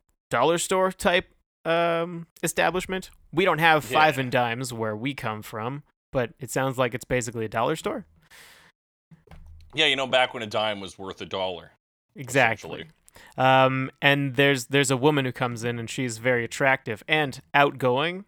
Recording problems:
none

